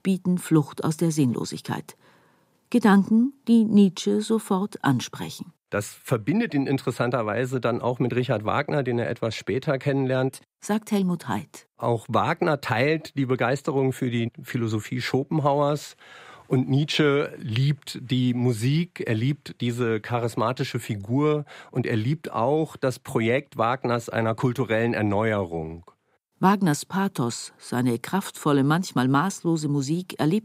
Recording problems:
none

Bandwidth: 15.5 kHz